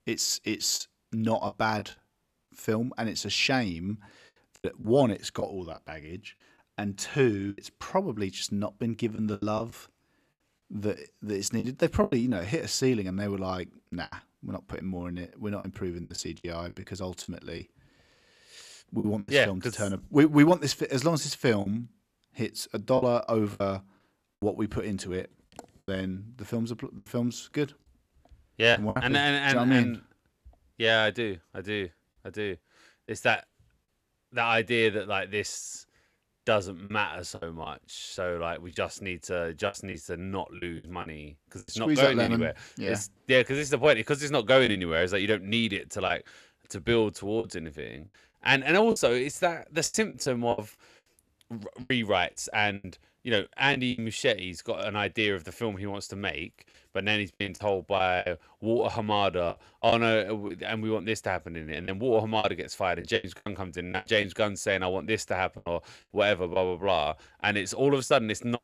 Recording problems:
choppy; very; 6% of the speech affected

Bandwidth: 14 kHz